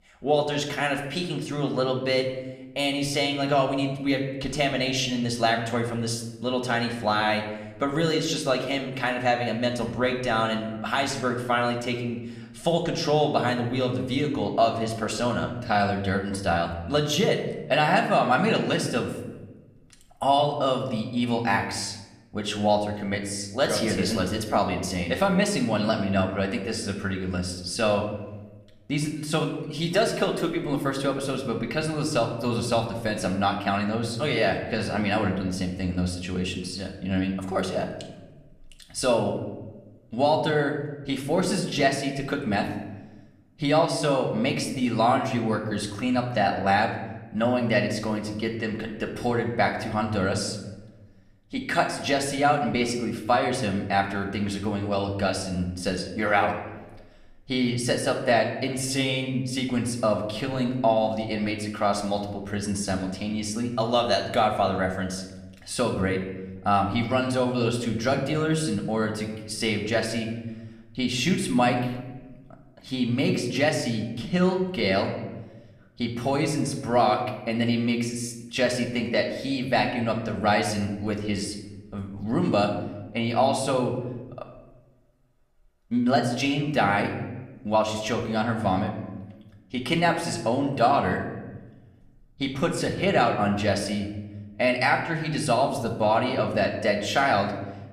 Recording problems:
room echo; slight; dies away in 0.9 s
off-mic speech; somewhat distant

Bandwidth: 14.5 kHz